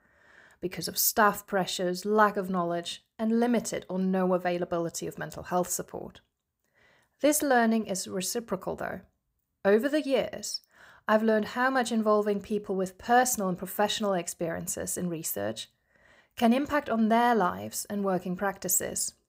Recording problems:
none

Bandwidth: 15.5 kHz